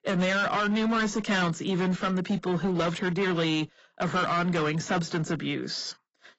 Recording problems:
garbled, watery; badly; nothing above 7.5 kHz
distortion; slight; 16% of the sound clipped

